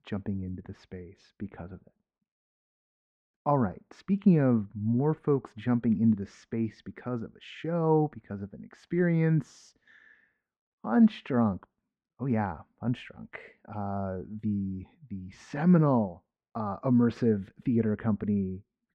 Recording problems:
muffled; very; fading above 1.5 kHz

